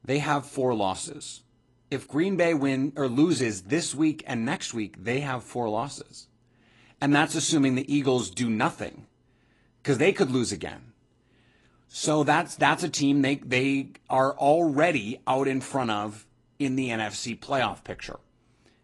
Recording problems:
garbled, watery; slightly

